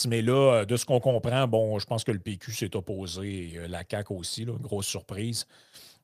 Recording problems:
abrupt cut into speech; at the start

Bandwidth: 15 kHz